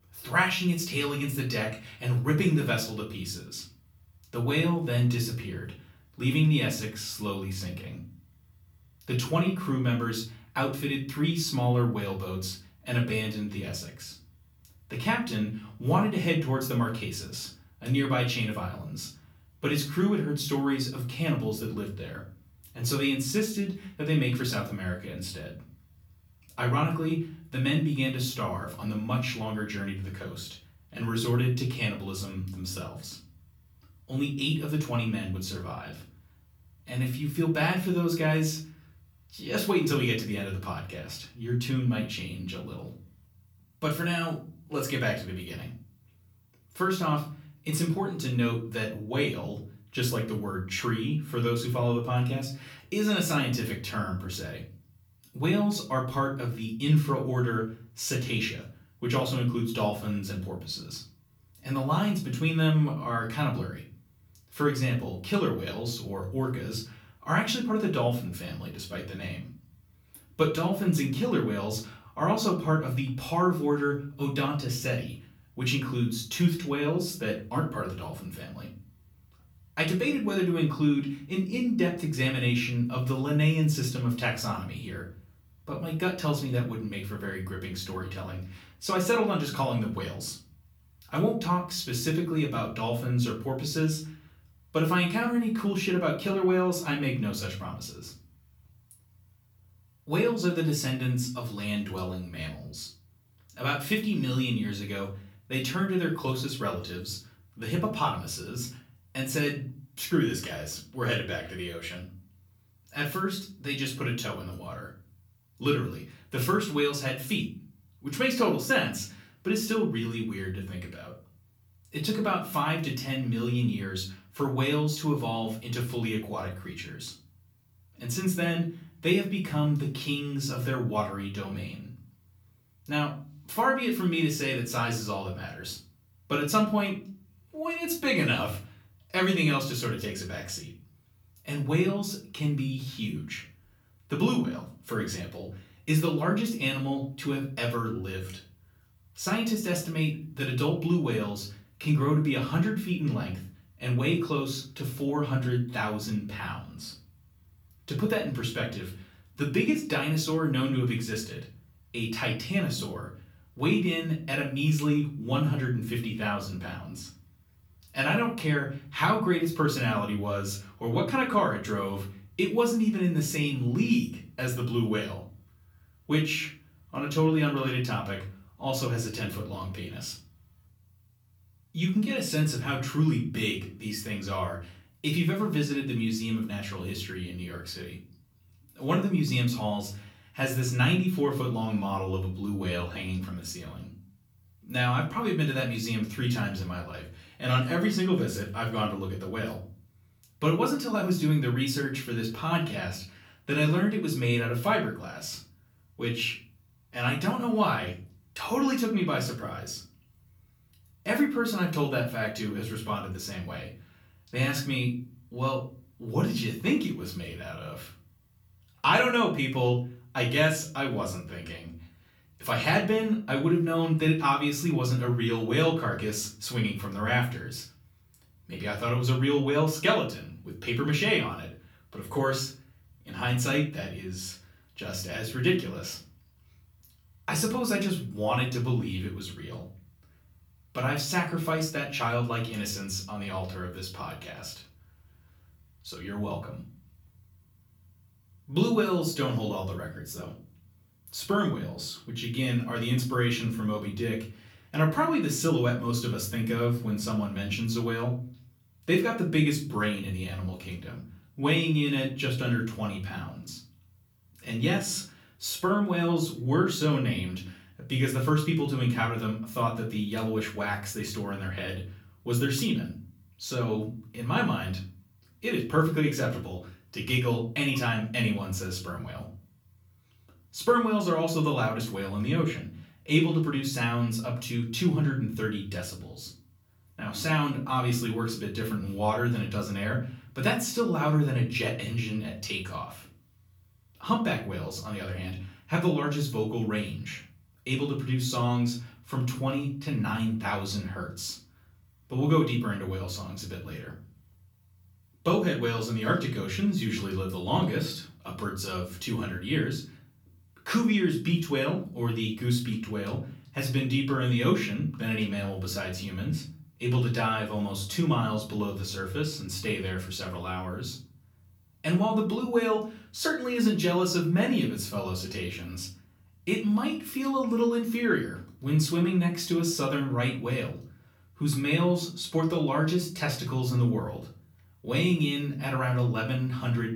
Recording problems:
off-mic speech; far
room echo; slight; dies away in 0.4 s

